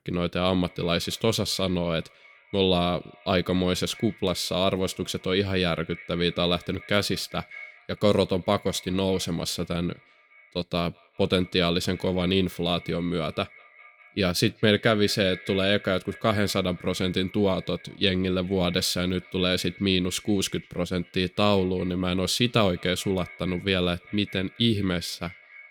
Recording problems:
echo of what is said; faint; throughout; 200 ms later, 20 dB below the speech

